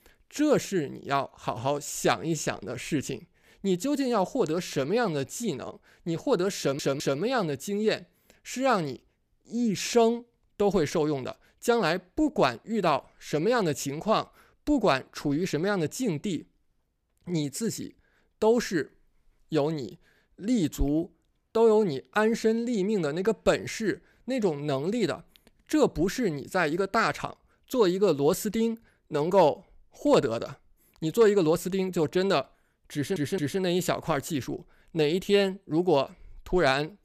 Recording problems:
audio stuttering; at 6.5 s and at 33 s

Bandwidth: 14.5 kHz